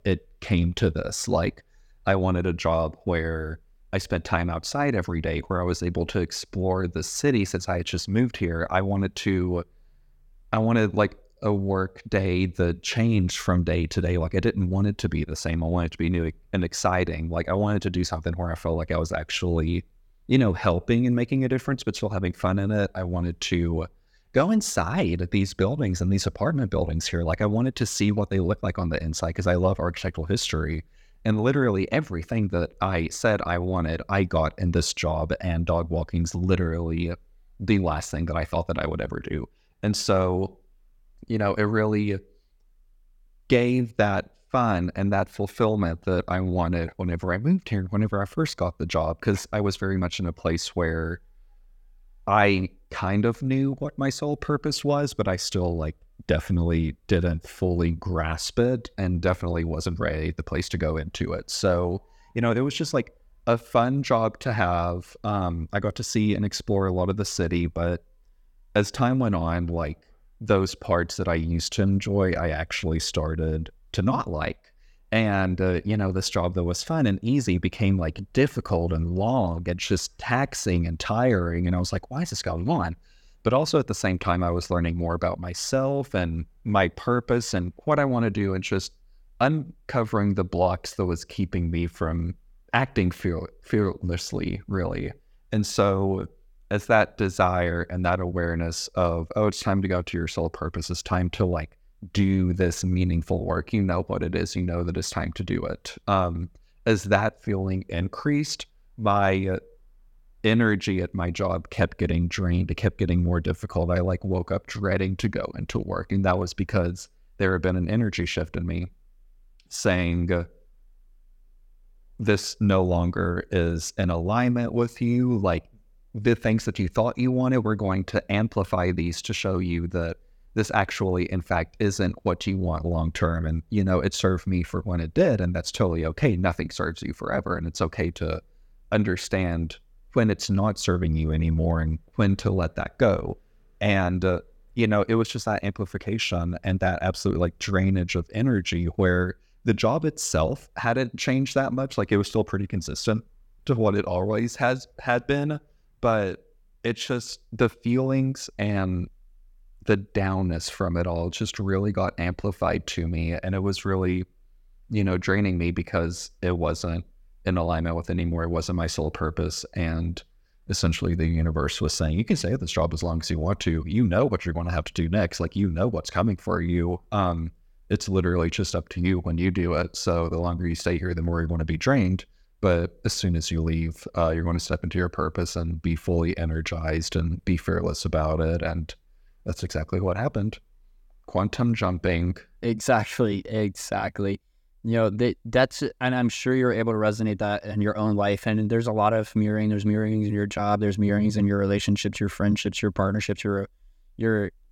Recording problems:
none

